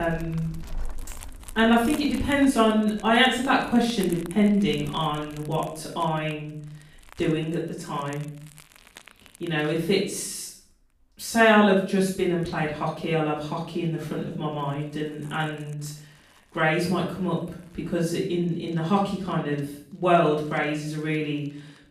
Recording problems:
off-mic speech; far
room echo; noticeable; dies away in 0.5 s
household noises; faint; throughout; 20 dB below the speech
abrupt cut into speech; at the start

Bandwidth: 15 kHz